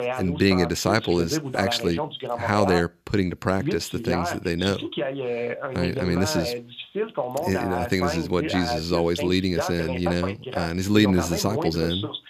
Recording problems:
voice in the background; loud; throughout; 5 dB below the speech

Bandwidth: 14.5 kHz